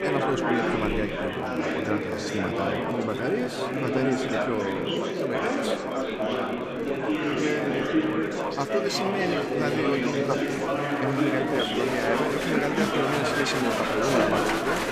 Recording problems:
echo of what is said; strong; throughout; 360 ms later, 10 dB below the speech
murmuring crowd; very loud; throughout; 3 dB above the speech
crackle, like an old record; faint; 25 dB below the speech

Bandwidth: 14.5 kHz